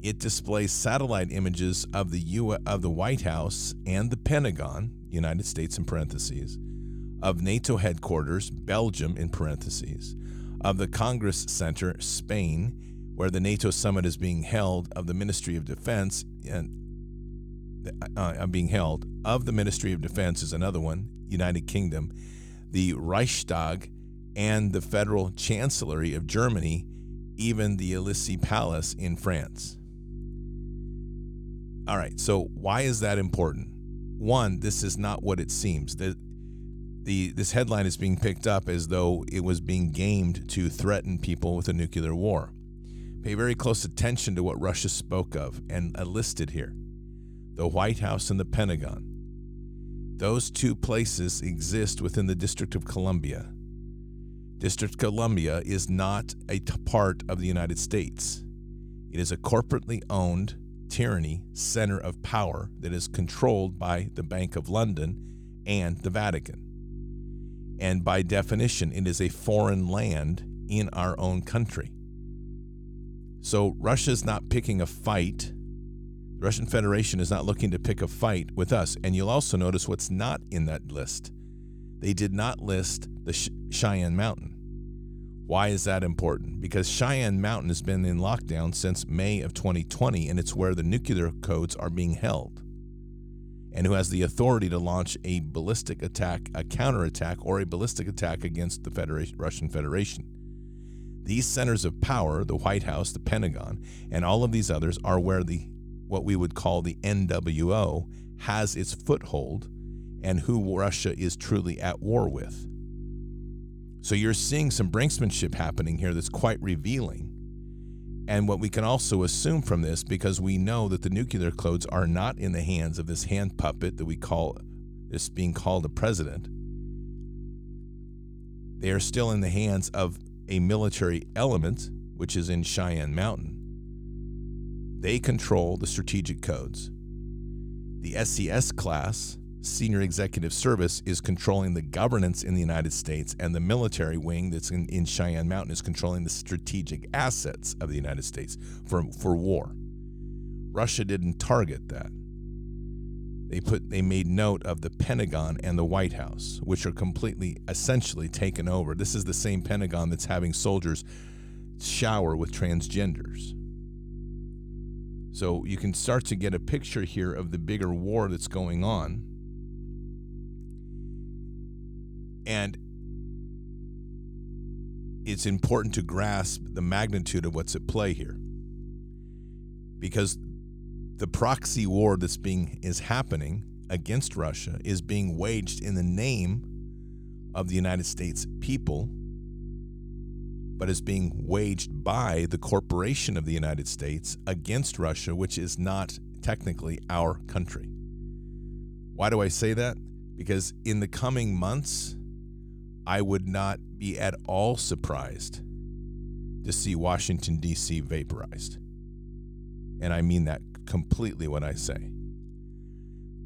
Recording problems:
electrical hum; faint; throughout; 50 Hz, 20 dB below the speech

